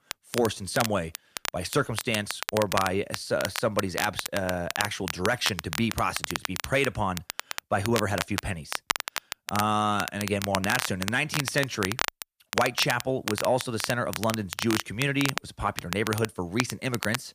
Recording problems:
crackle, like an old record; loud; 5 dB below the speech

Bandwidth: 15 kHz